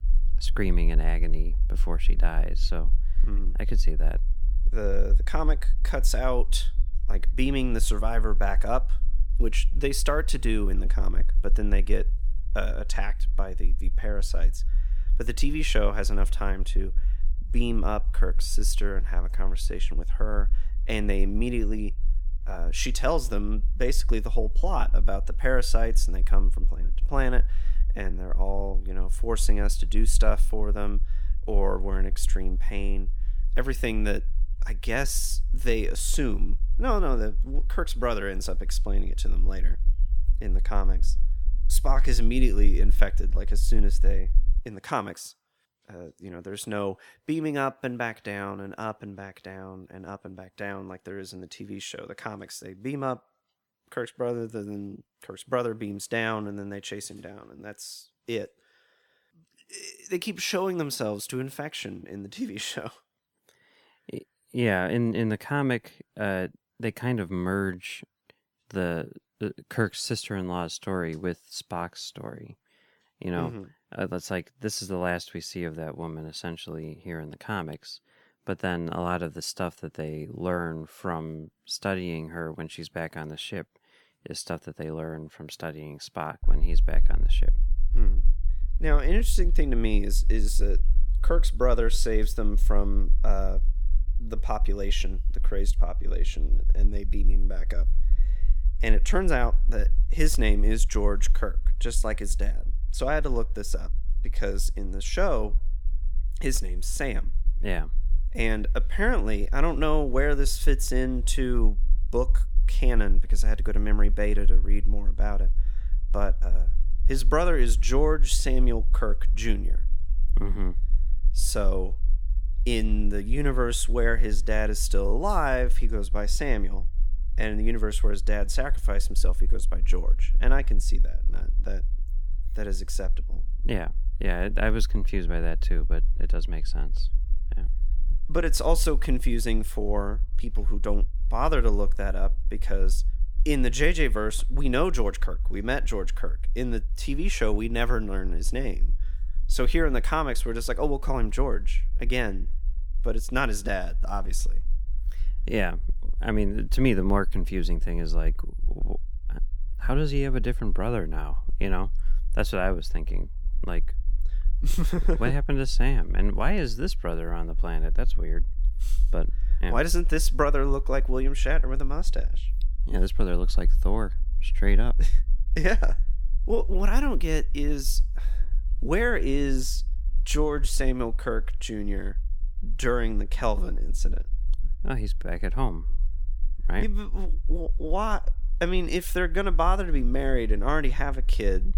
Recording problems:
low rumble; faint; until 45 s and from 1:26 on; 25 dB below the speech

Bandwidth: 18 kHz